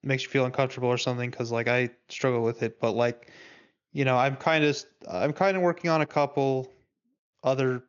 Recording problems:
high frequencies cut off; noticeable; nothing above 7 kHz

